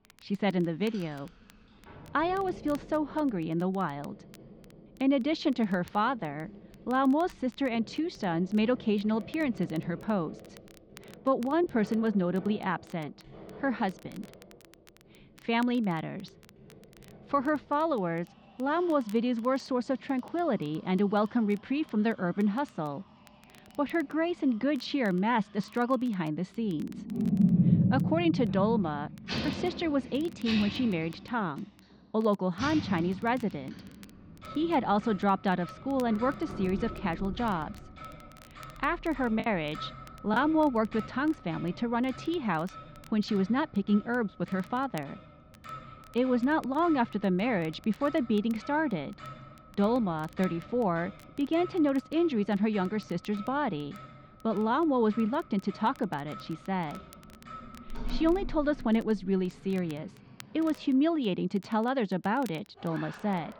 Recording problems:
muffled; slightly; fading above 4 kHz
household noises; loud; throughout; 9 dB below the speech
crackle, like an old record; faint; 30 dB below the speech
choppy; occasionally; at 39 s; 3% of the speech affected

